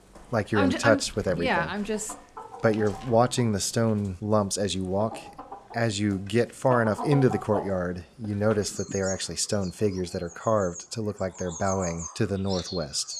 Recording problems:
animal sounds; noticeable; throughout; 10 dB below the speech

